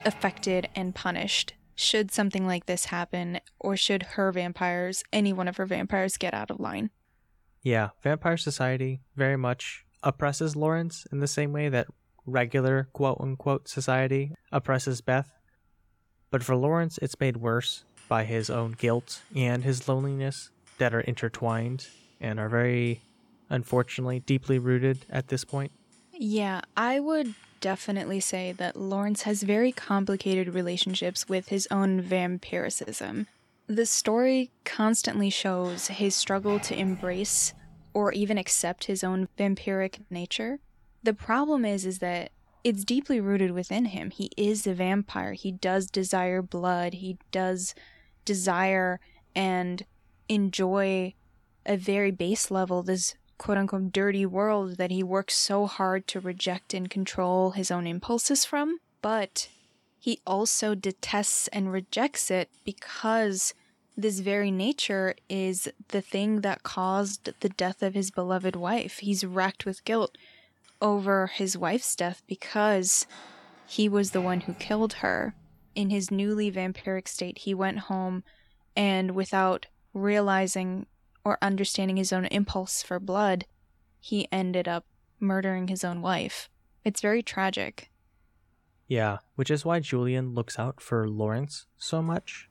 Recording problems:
household noises; faint; throughout; 25 dB below the speech

